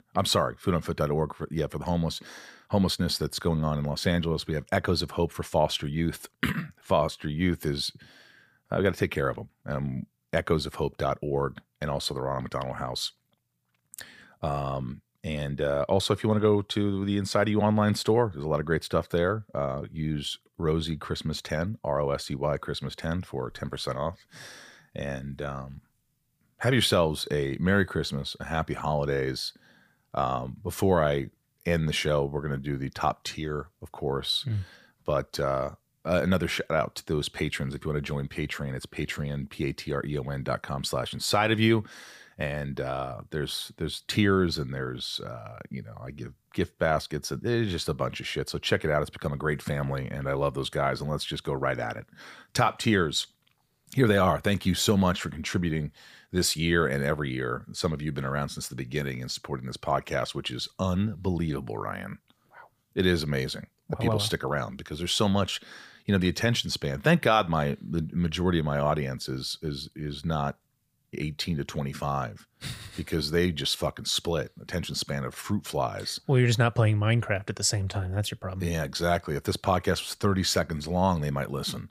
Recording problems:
none

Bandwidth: 15 kHz